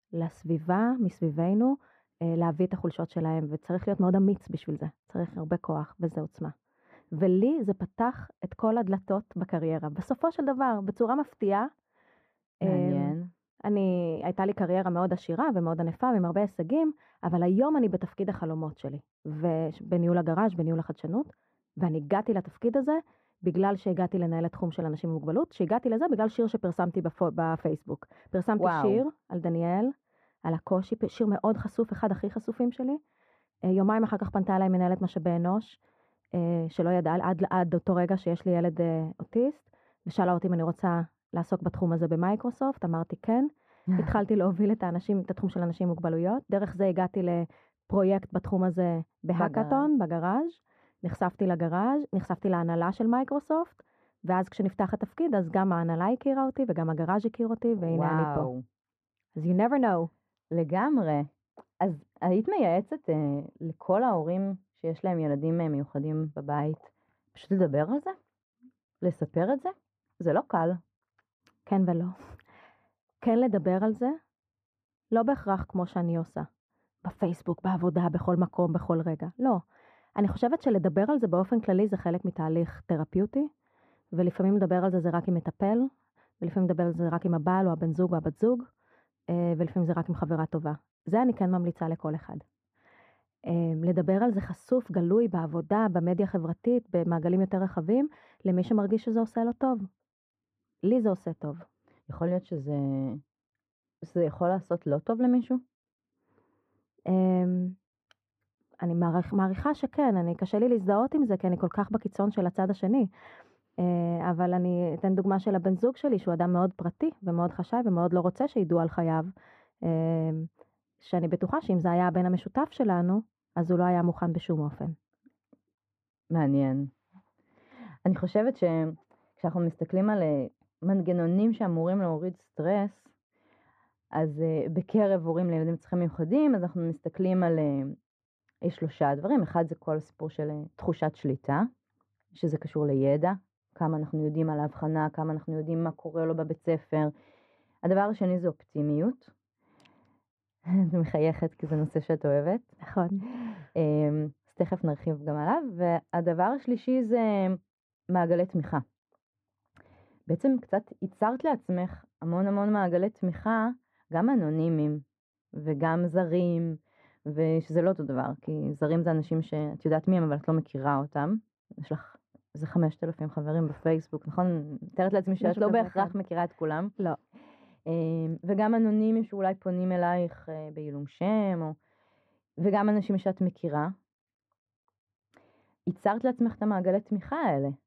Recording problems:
muffled; very; fading above 3 kHz

